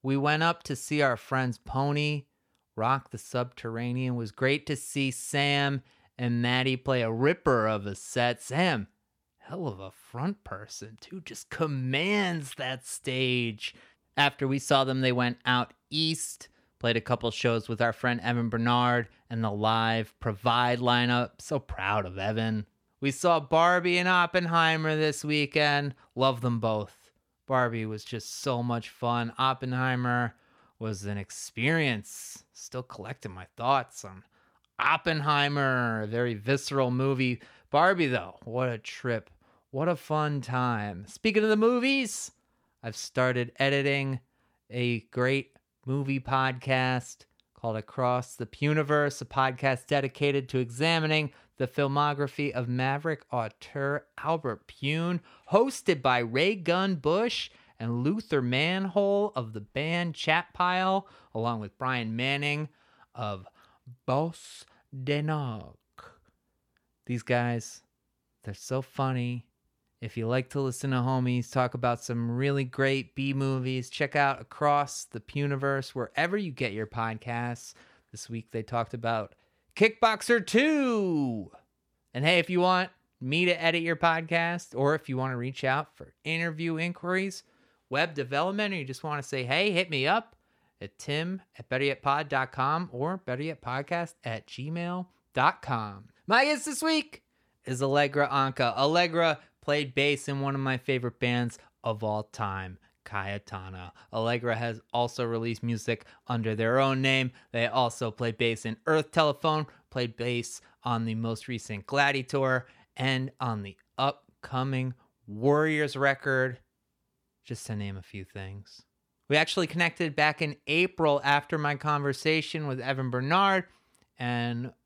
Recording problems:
none

